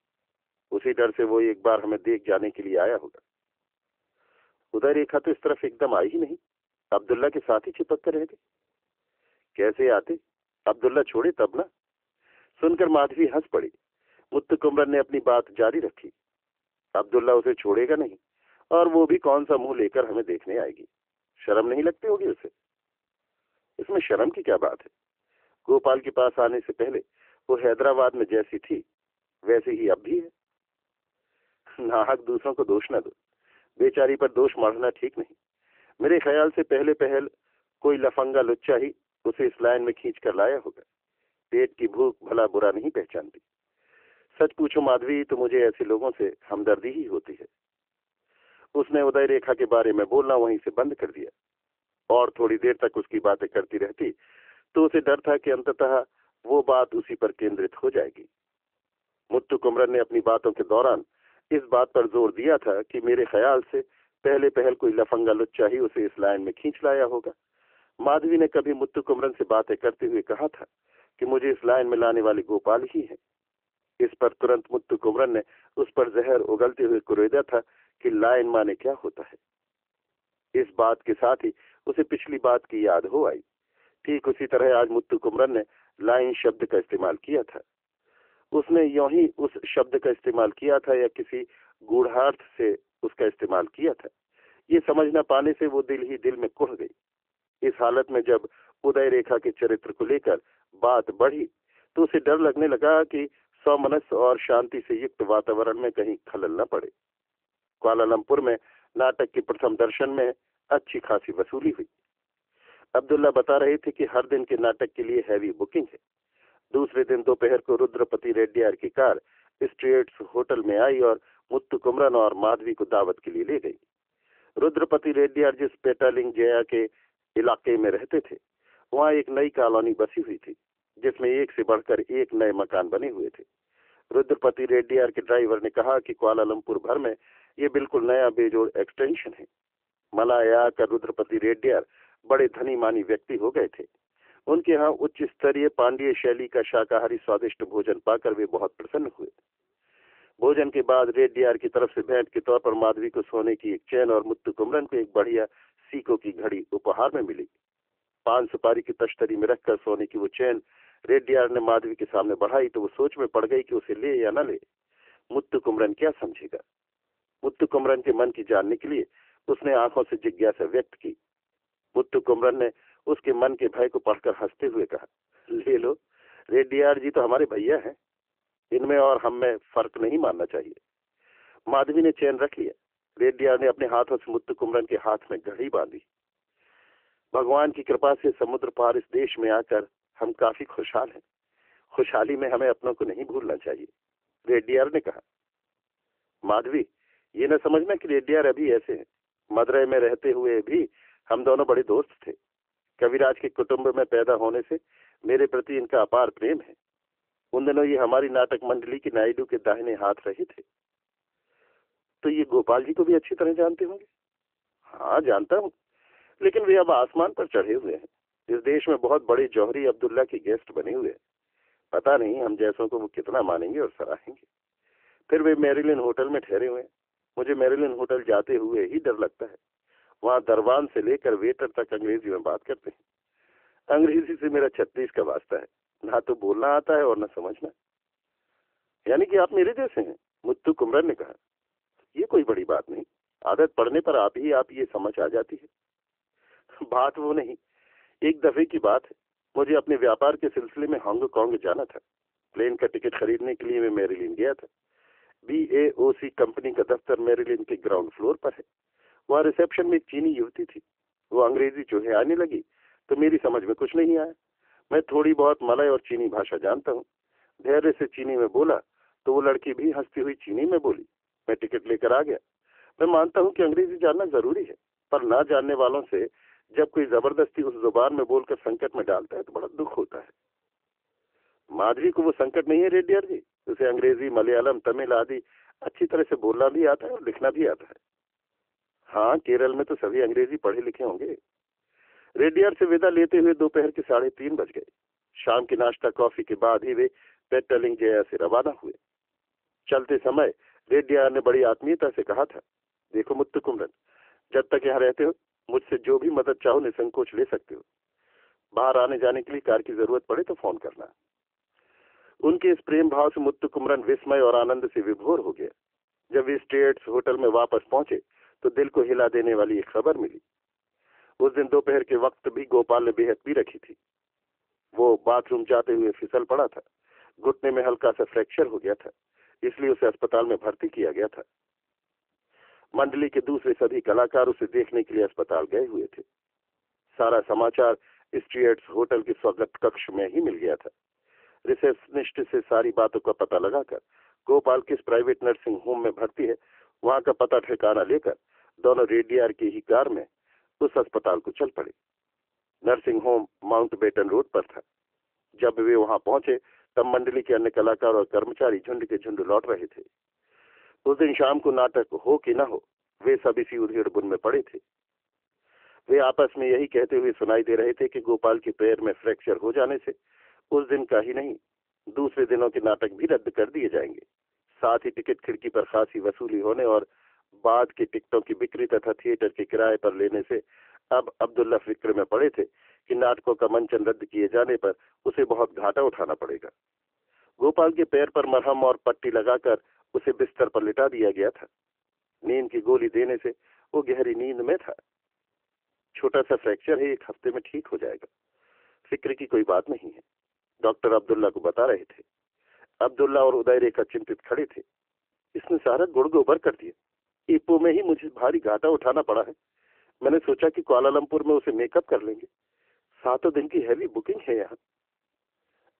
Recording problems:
phone-call audio; nothing above 3 kHz

